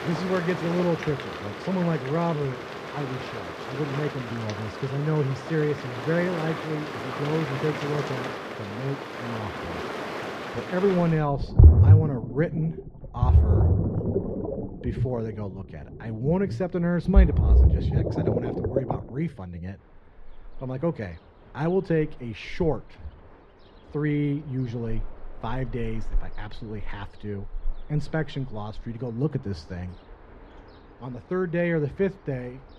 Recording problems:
muffled; very; fading above 4 kHz
rain or running water; very loud; throughout; 3 dB above the speech

